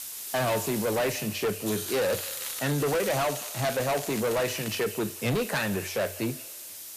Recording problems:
distortion; heavy; 19% of the sound clipped
echo of what is said; faint; throughout; 180 ms later, 20 dB below the speech
hiss; loud; throughout; 7 dB below the speech
crackling; noticeable; from 2 to 5 s; 15 dB below the speech

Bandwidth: 14.5 kHz